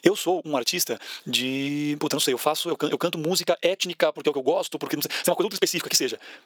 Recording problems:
wrong speed, natural pitch; too fast; 1.7 times normal speed
thin; somewhat; fading below 500 Hz
squashed, flat; somewhat

